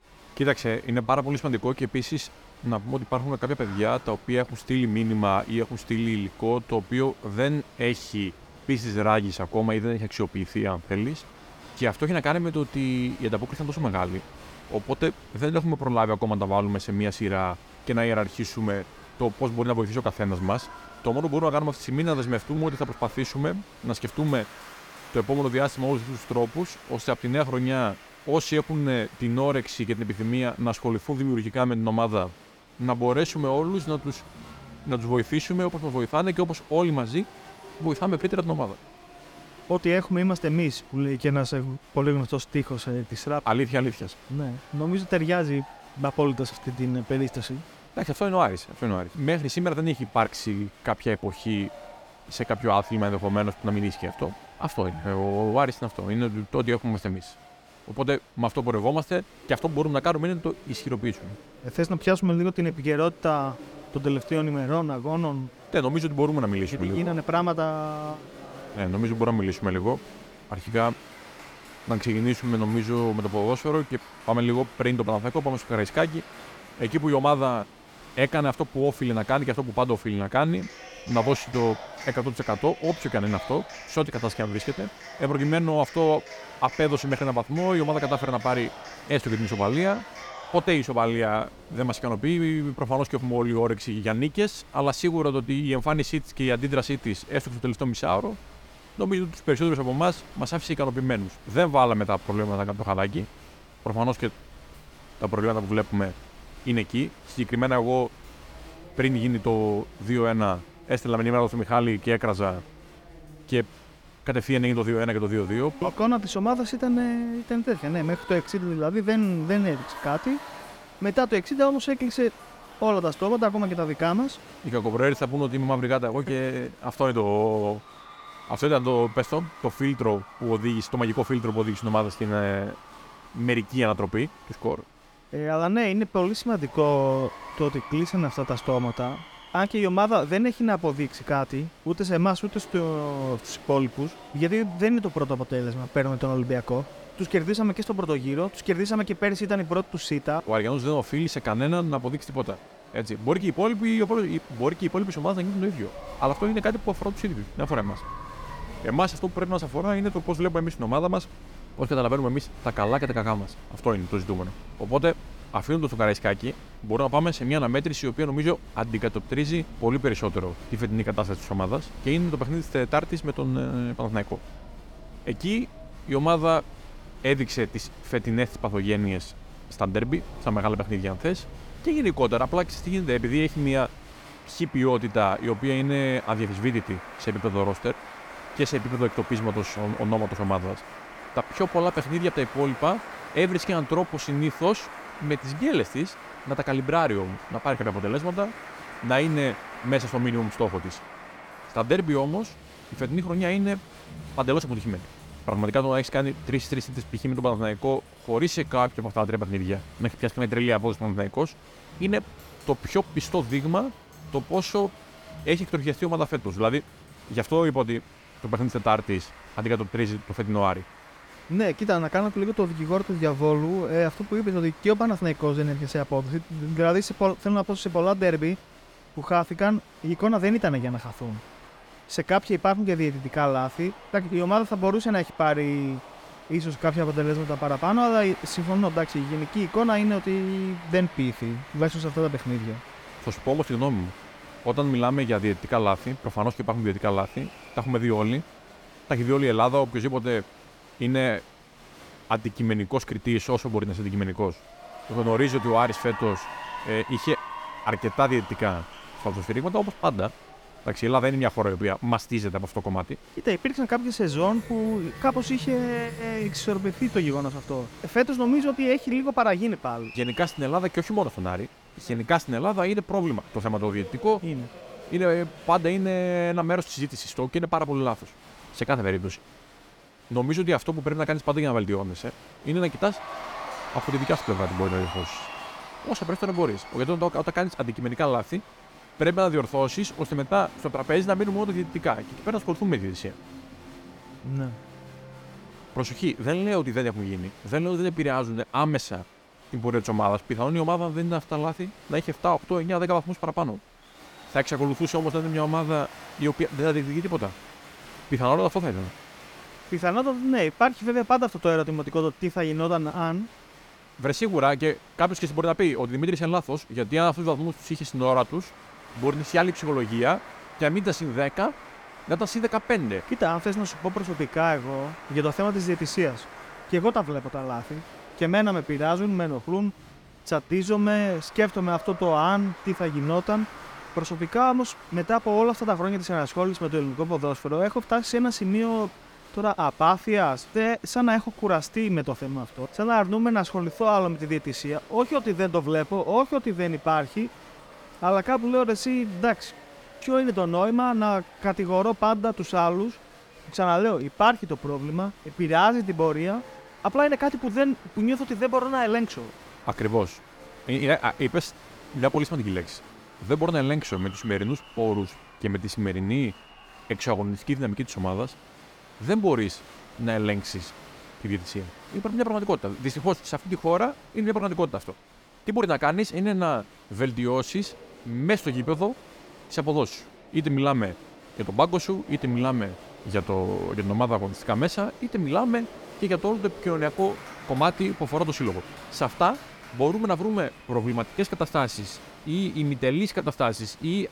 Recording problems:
crowd noise; noticeable; throughout; 20 dB below the speech

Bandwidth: 18 kHz